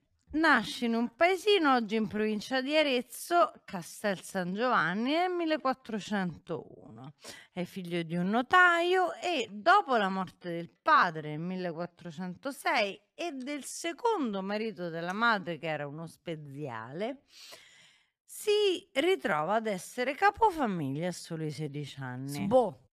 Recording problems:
wrong speed, natural pitch; too slow; 0.6 times normal speed

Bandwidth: 14.5 kHz